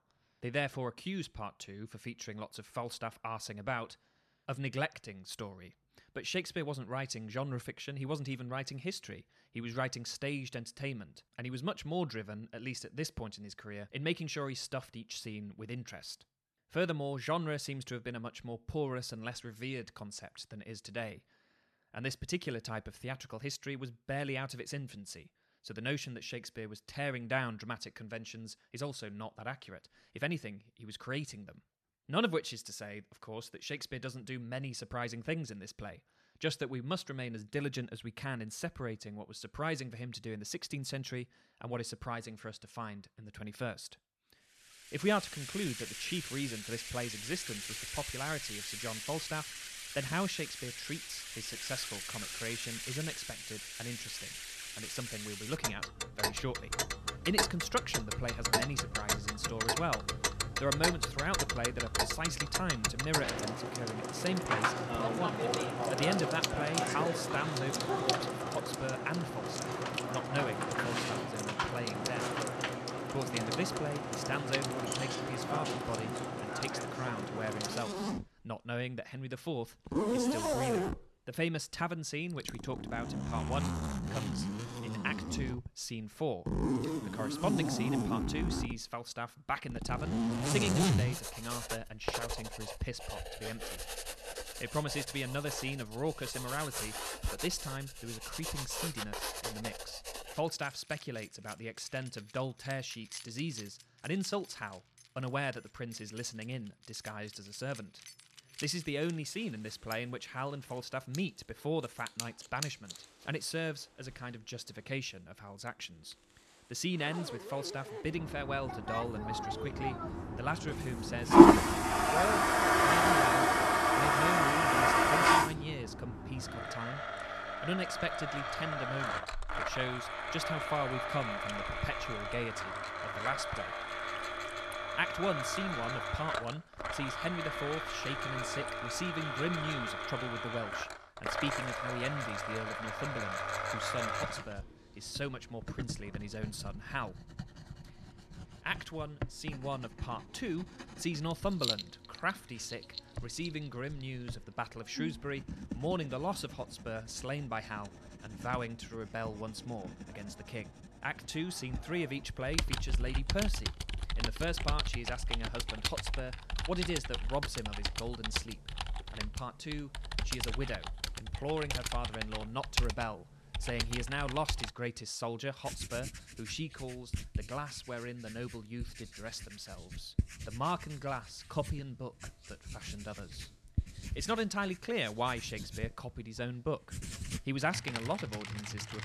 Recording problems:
household noises; very loud; from 45 s on; 5 dB above the speech

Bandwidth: 13.5 kHz